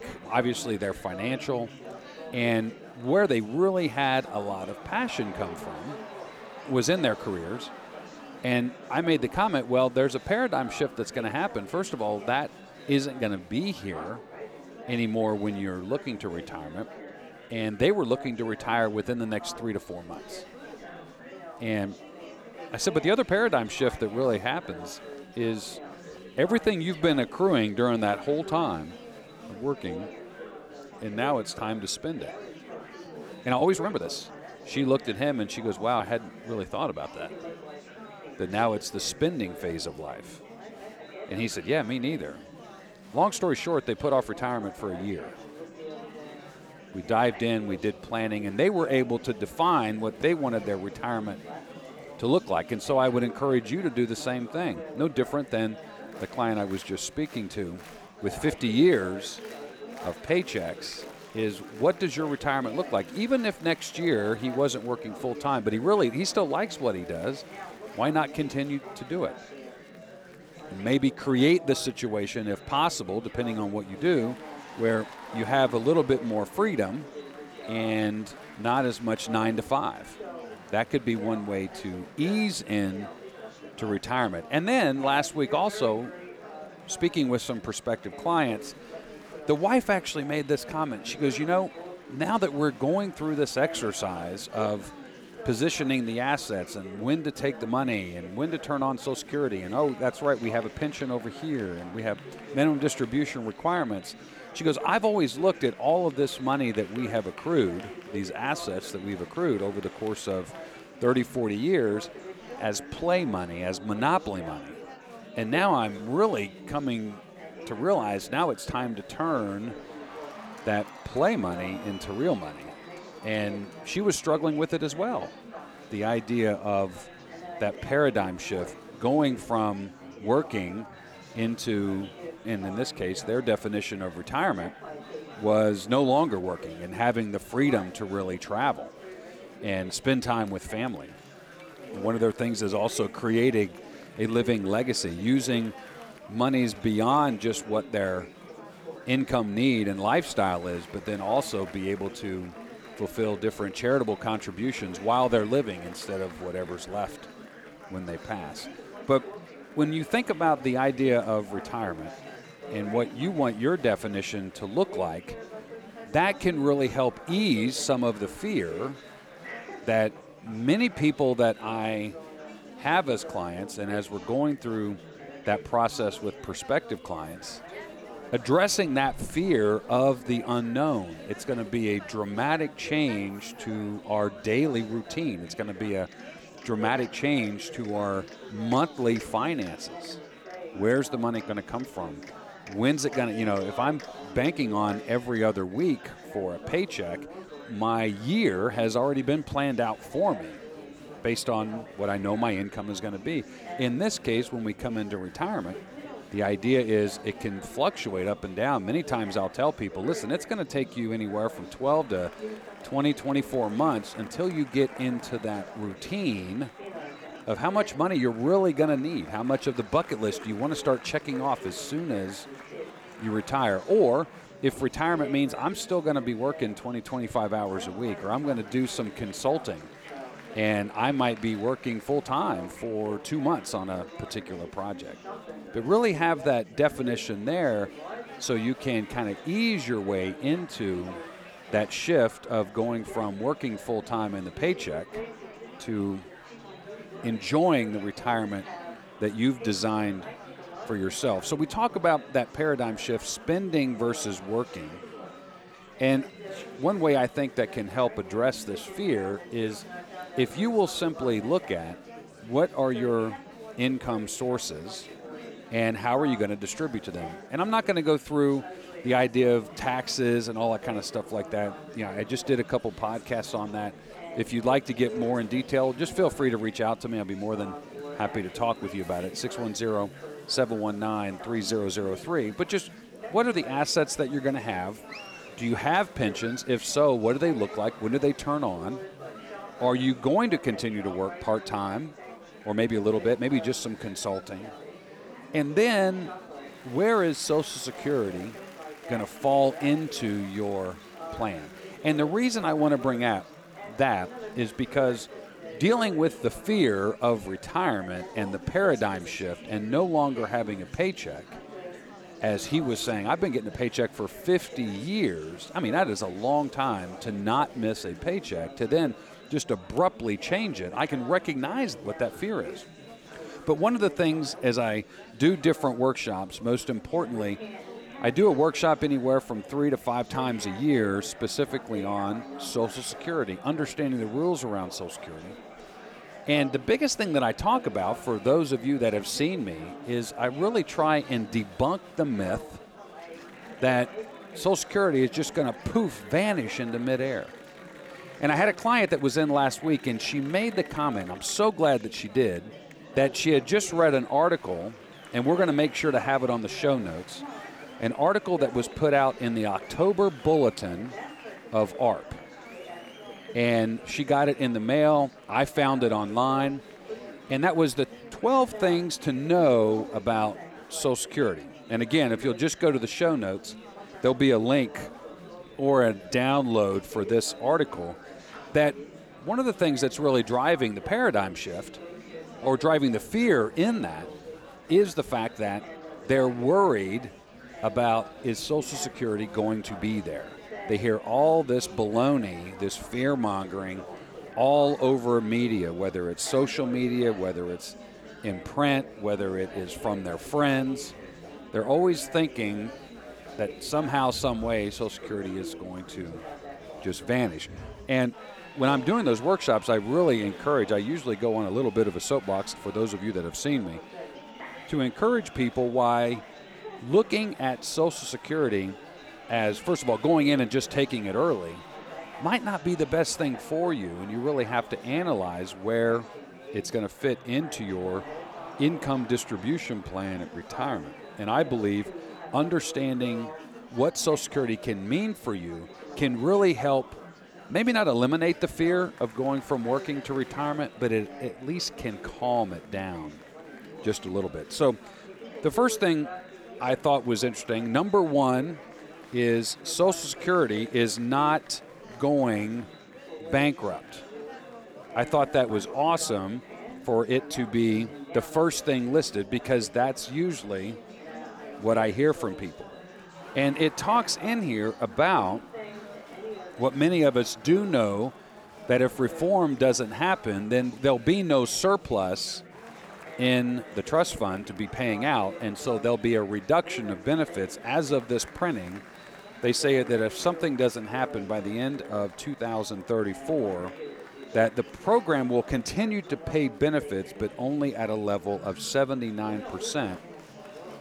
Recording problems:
chatter from many people; noticeable; throughout; 15 dB below the speech
uneven, jittery; strongly; from 33 s to 7:55

